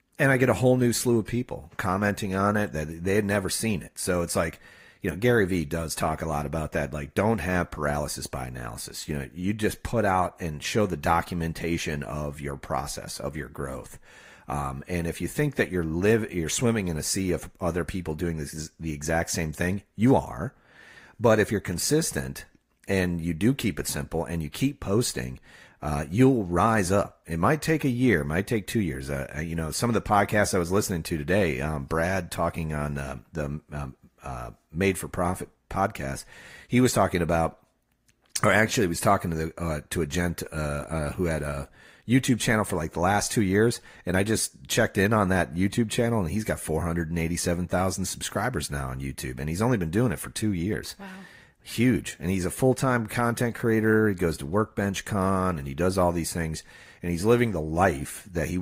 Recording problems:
garbled, watery; slightly; nothing above 15.5 kHz
abrupt cut into speech; at the end

